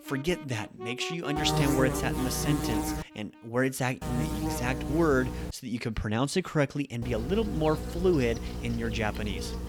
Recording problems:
electrical hum; loud; from 1.5 to 3 s, from 4 to 5.5 s and from 7 s on; 60 Hz, 5 dB below the speech
background music; noticeable; throughout; 10 dB below the speech

